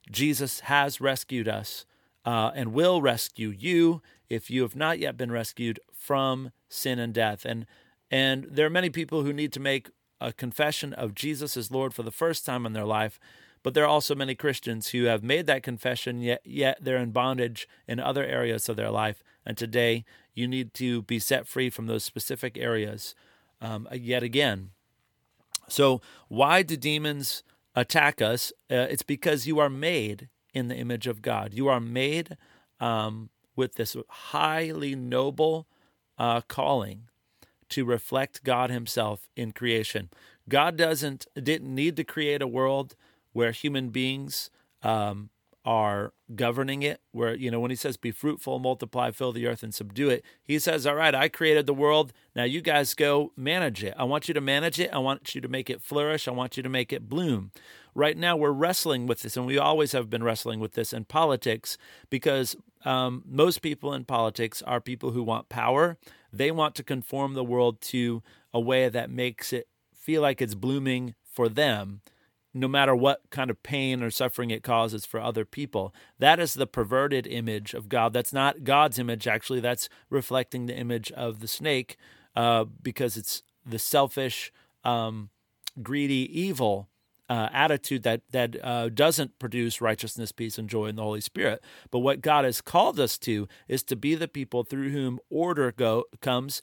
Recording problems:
none

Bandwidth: 18 kHz